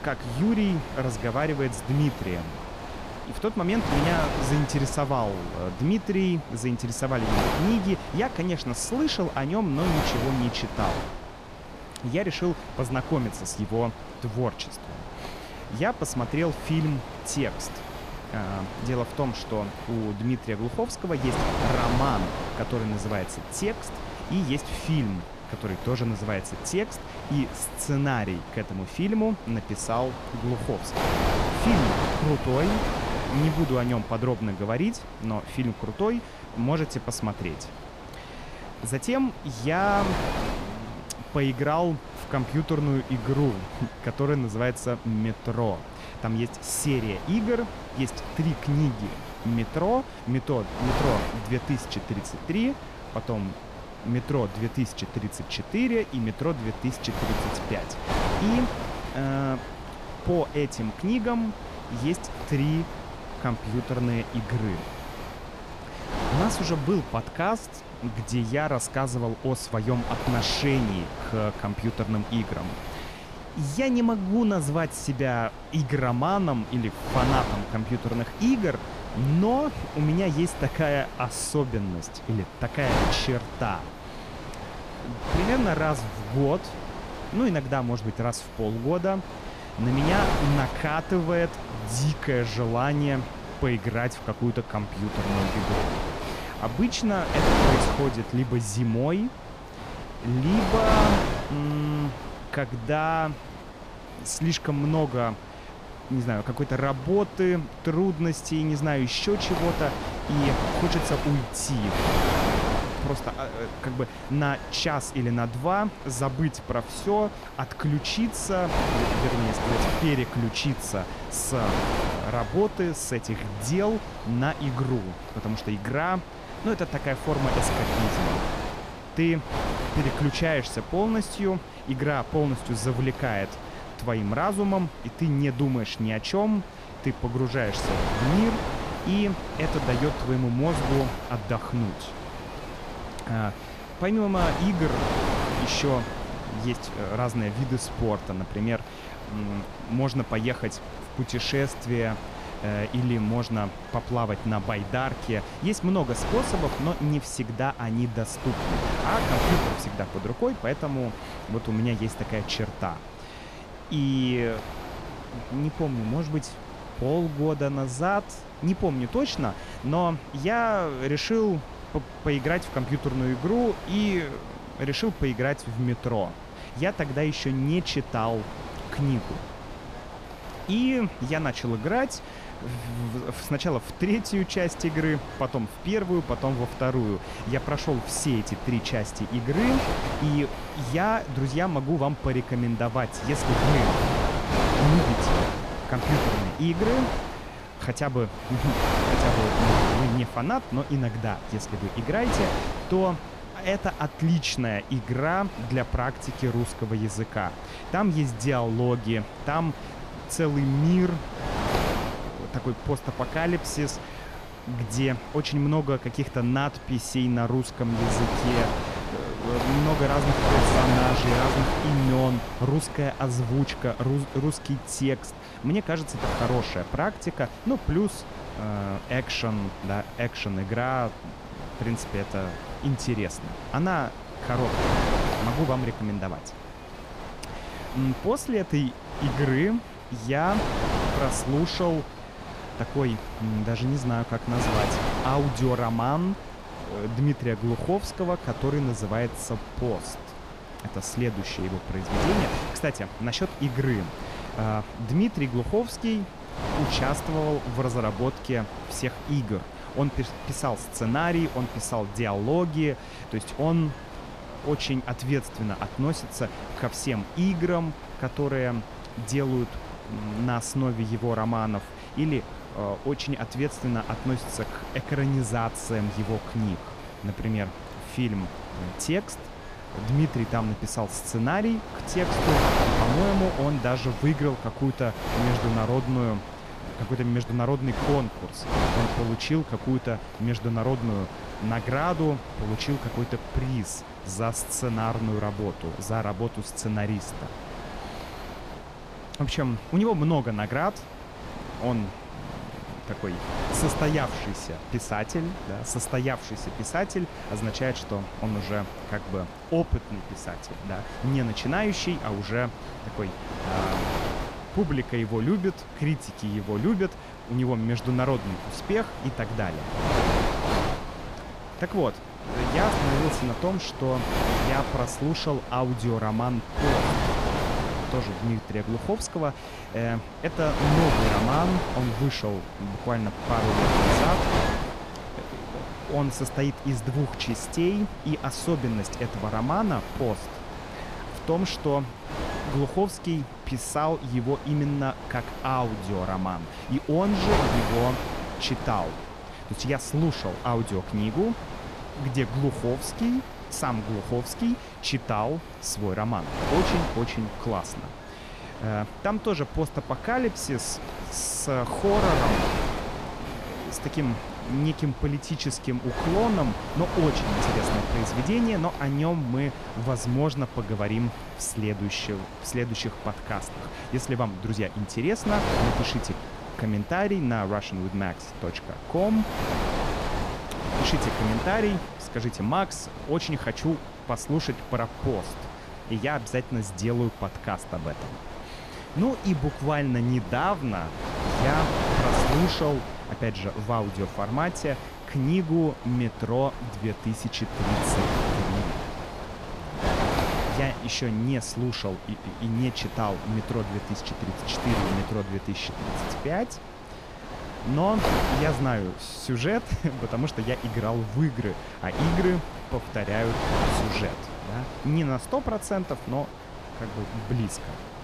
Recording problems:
wind noise on the microphone; heavy; 3 dB below the speech

